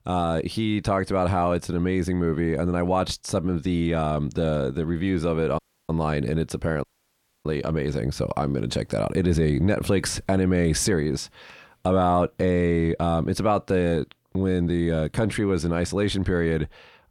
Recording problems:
audio cutting out; at 5.5 s and at 7 s for 0.5 s

